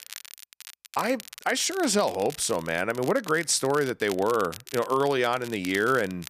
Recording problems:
crackle, like an old record; noticeable; 15 dB below the speech

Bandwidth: 14.5 kHz